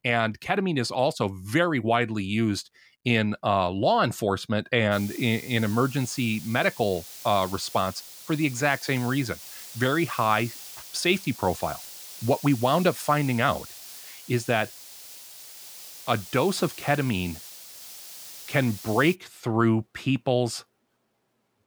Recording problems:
hiss; noticeable; from 5 to 19 s; 15 dB below the speech

